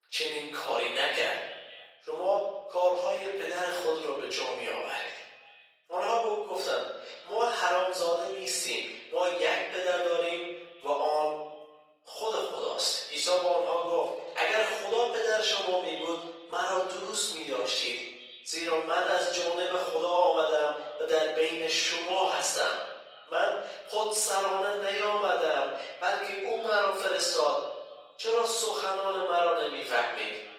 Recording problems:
off-mic speech; far
thin; very; fading below 500 Hz
room echo; noticeable; dies away in 1 s
echo of what is said; faint; throughout; 250 ms later, 20 dB below the speech
garbled, watery; slightly; nothing above 18.5 kHz

